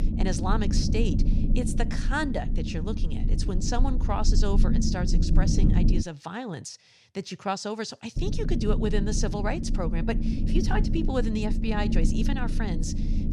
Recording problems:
low rumble; loud; until 6 s and from 8 s on; 5 dB below the speech

